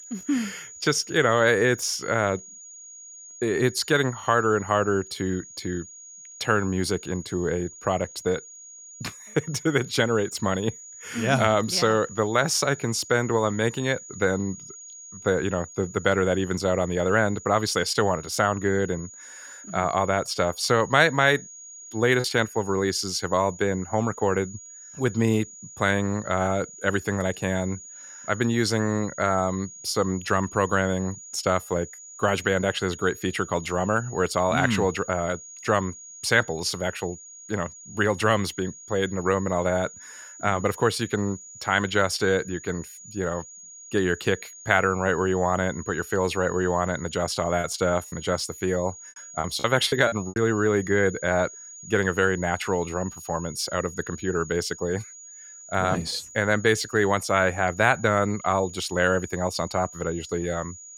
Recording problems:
high-pitched whine; noticeable; throughout; 7 kHz, 15 dB below the speech
choppy; very; at 22 s and from 48 to 50 s; 9% of the speech affected

